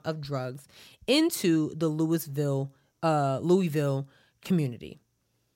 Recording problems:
none

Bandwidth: 16 kHz